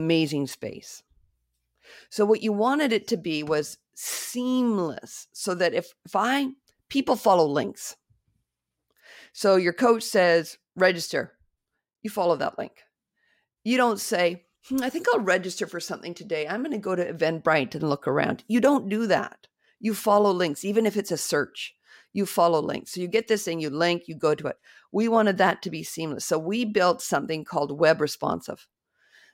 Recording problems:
abrupt cut into speech; at the start

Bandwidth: 16 kHz